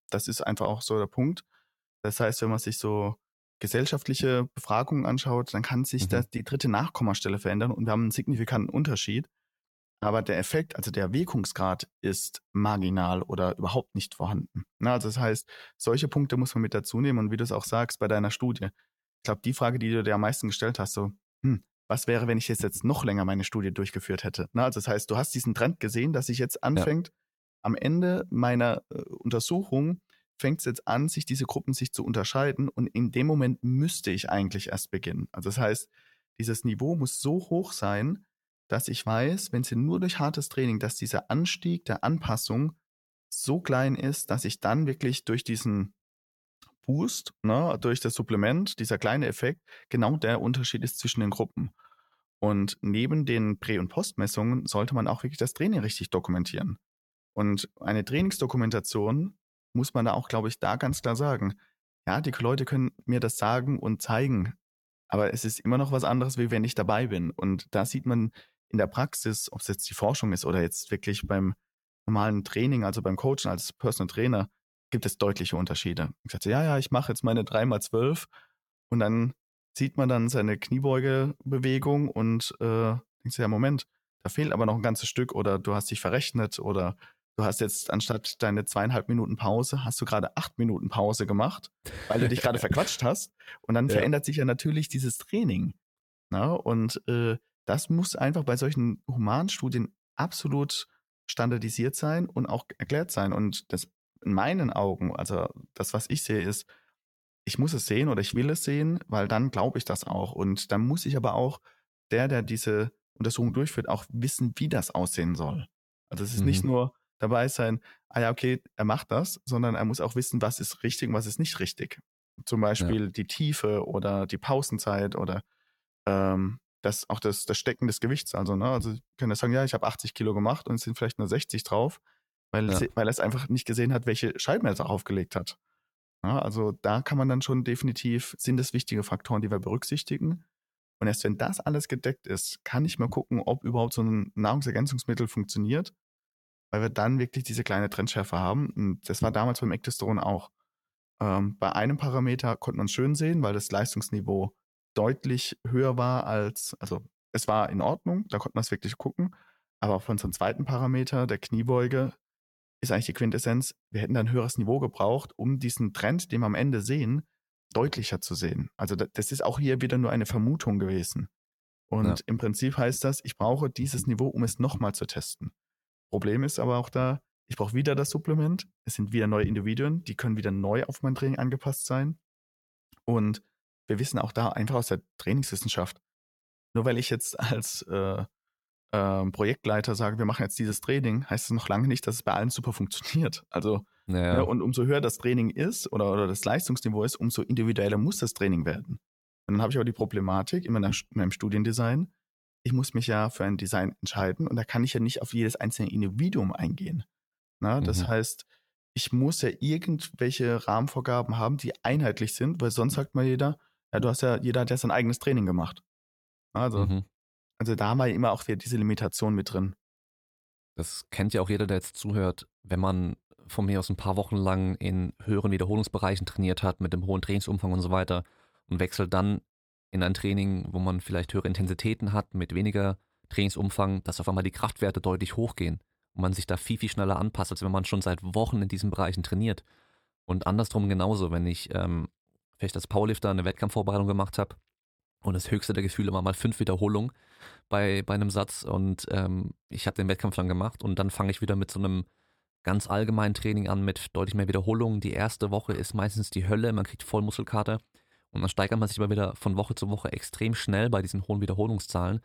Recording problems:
none

